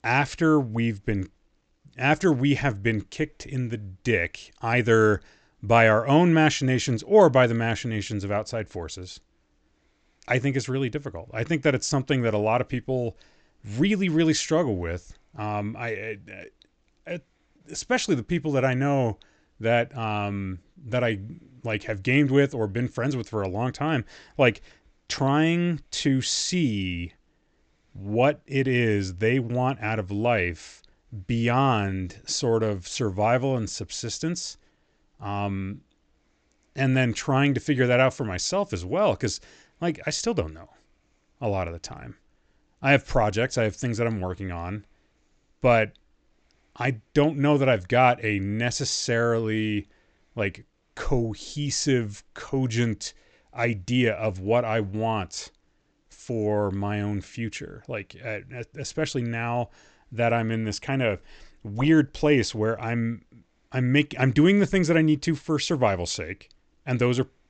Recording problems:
high frequencies cut off; noticeable; nothing above 8 kHz

